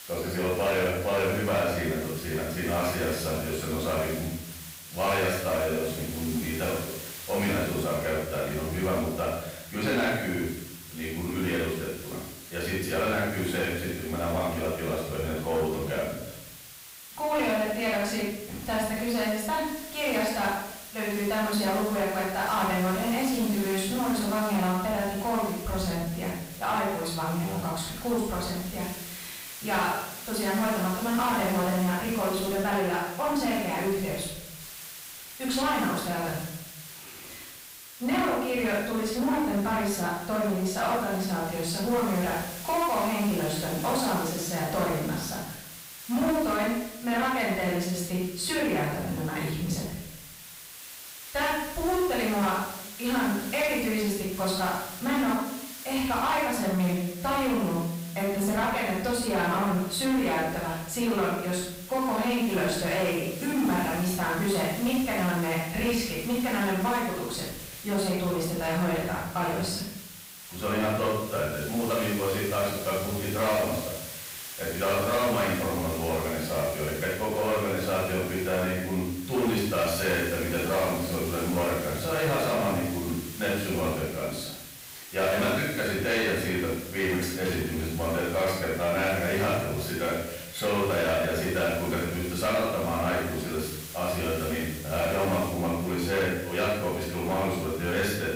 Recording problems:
off-mic speech; far
room echo; noticeable; dies away in 0.8 s
distortion; slight; 10 dB below the speech
hiss; noticeable; throughout; 10 dB below the speech

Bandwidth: 15.5 kHz